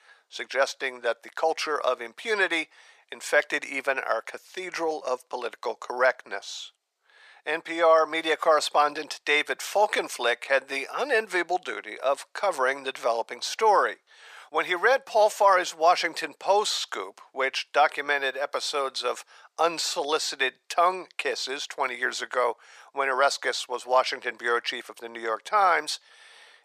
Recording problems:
thin; very; fading below 550 Hz

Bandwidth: 14.5 kHz